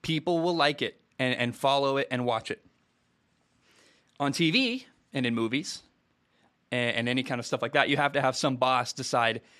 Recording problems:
none

